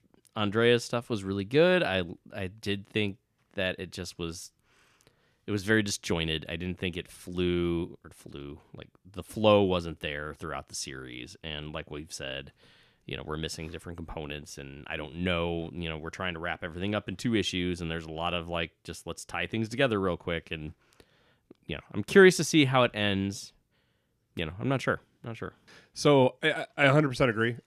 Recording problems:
none

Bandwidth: 14.5 kHz